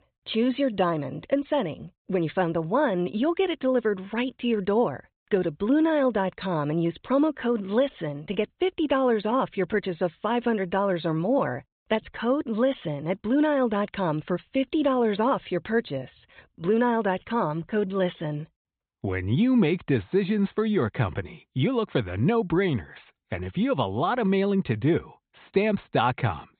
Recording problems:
high frequencies cut off; severe; nothing above 4 kHz

